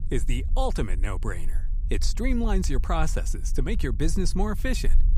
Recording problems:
low rumble; noticeable; throughout; 20 dB below the speech

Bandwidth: 15.5 kHz